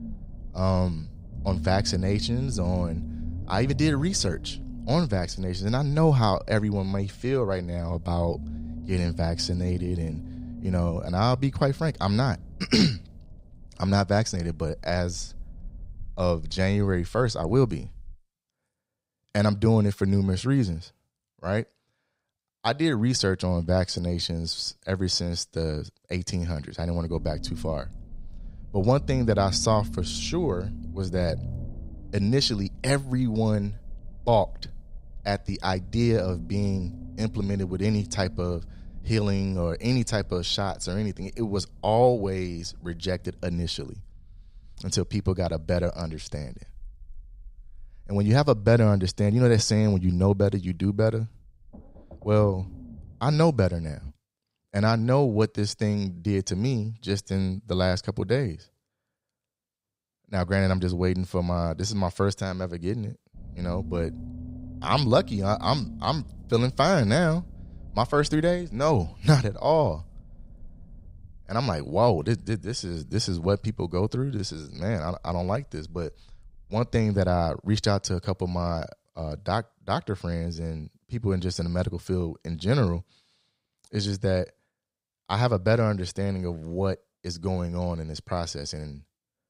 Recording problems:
low rumble; faint; until 18 s, from 27 to 54 s and from 1:03 to 1:18; 20 dB below the speech

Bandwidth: 15.5 kHz